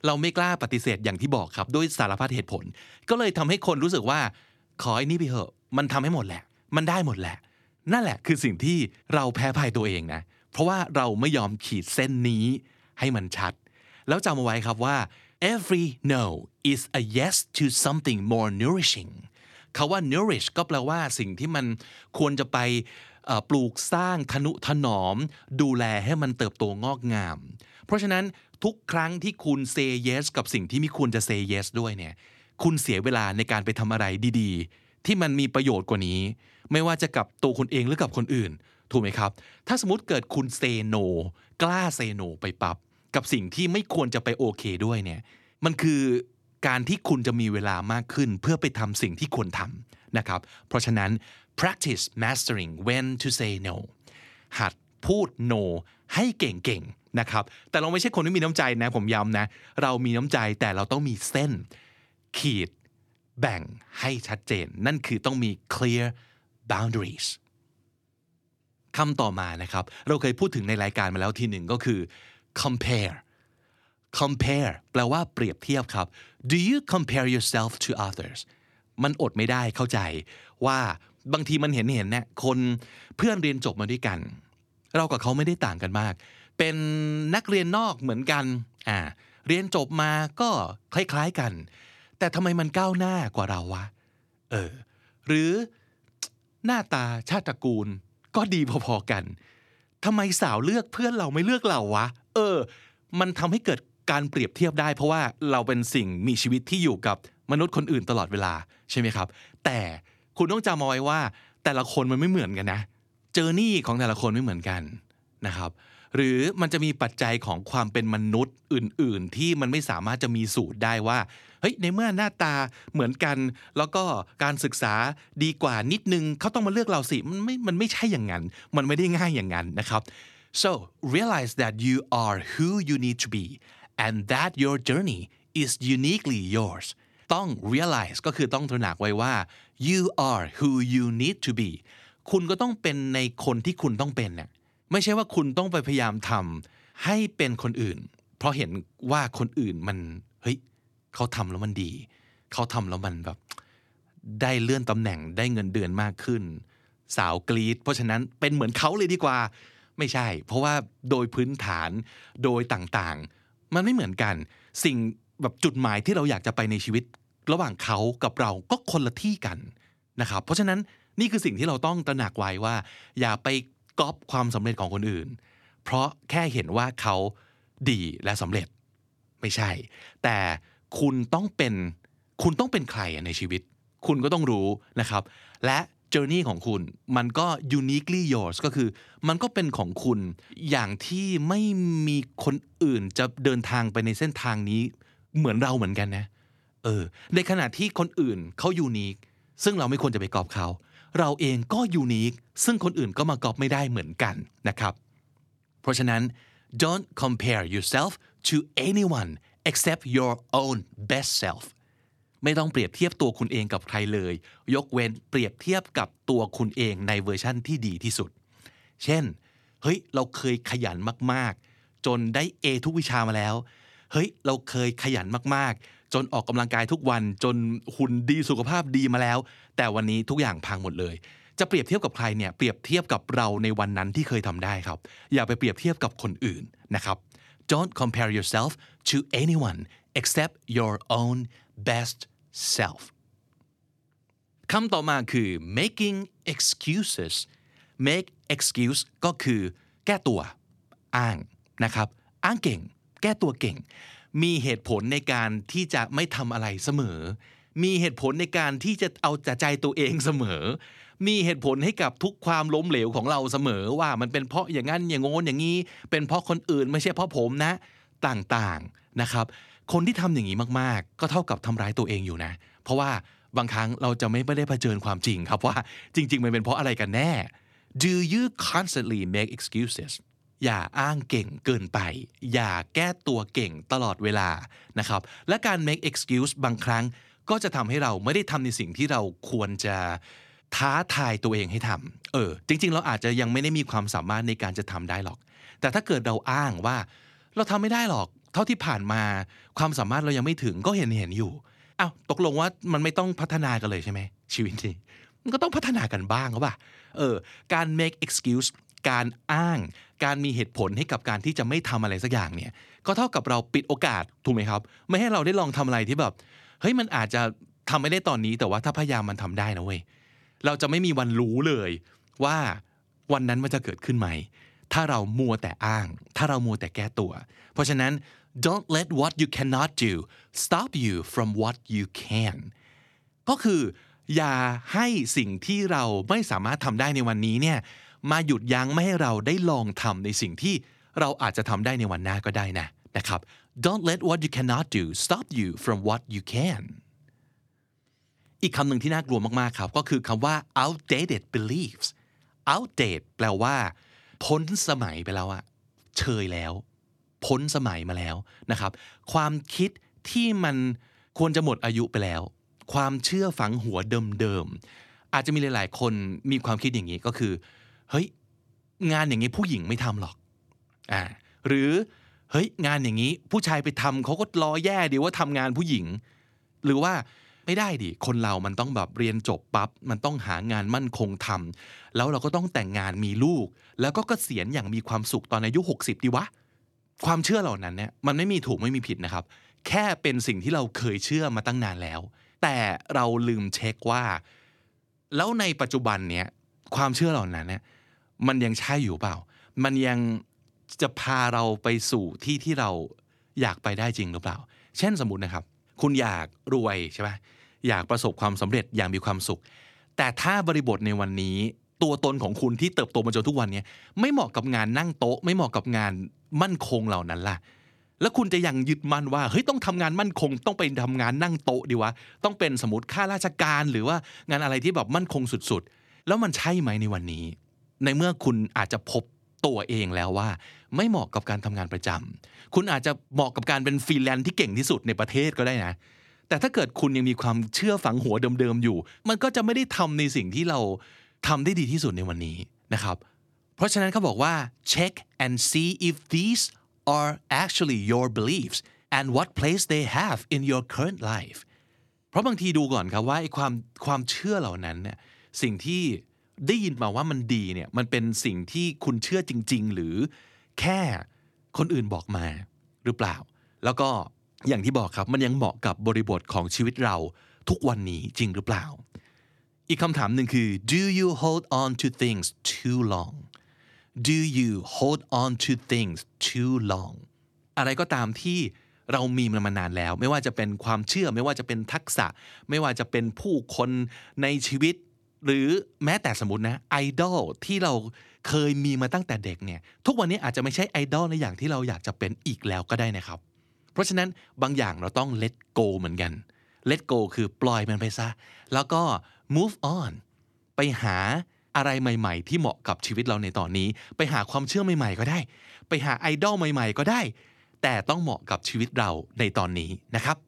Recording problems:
none

